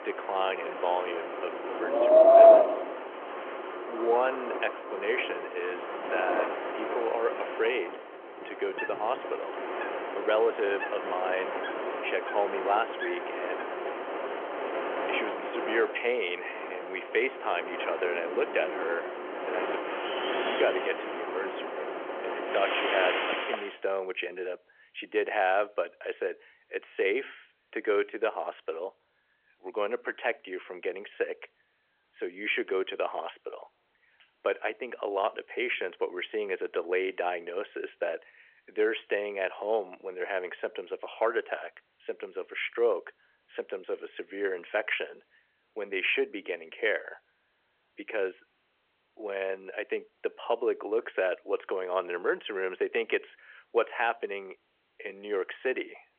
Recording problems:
phone-call audio; nothing above 3 kHz
wind in the background; very loud; until 24 s; 3 dB above the speech

